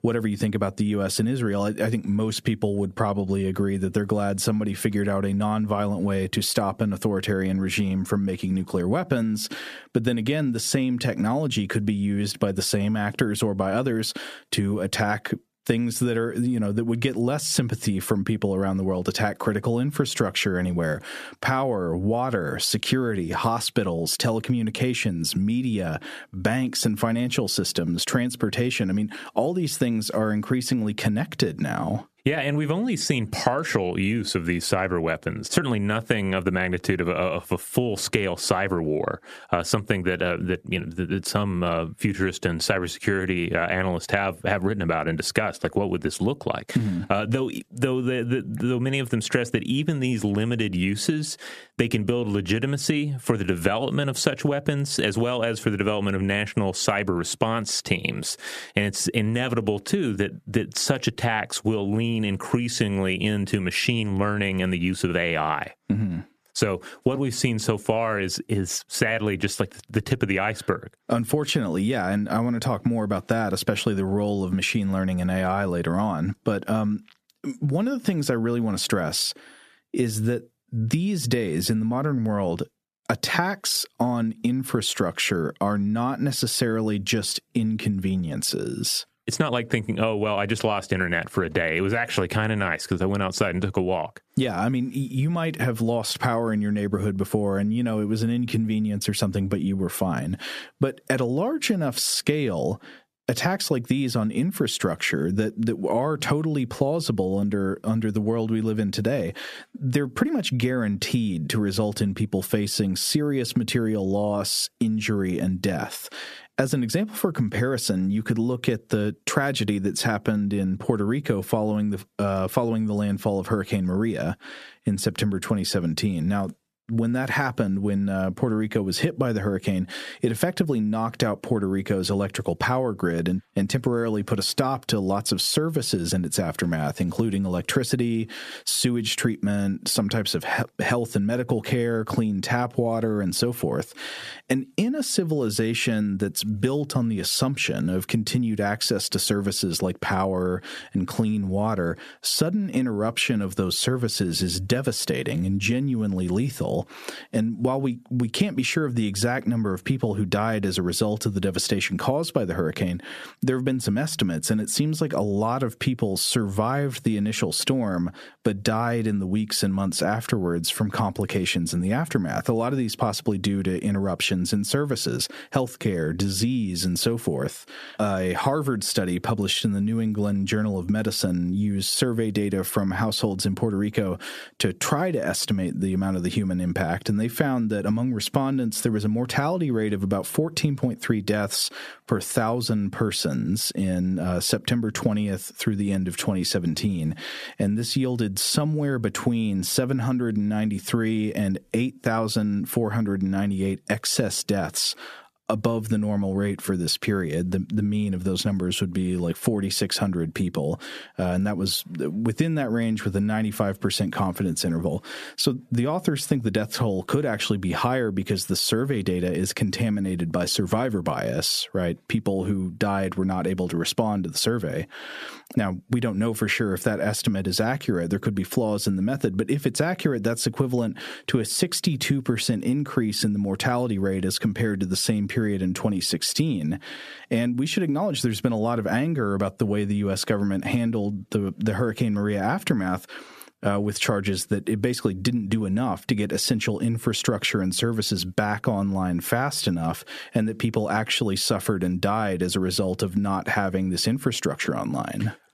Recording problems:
squashed, flat; somewhat

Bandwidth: 14.5 kHz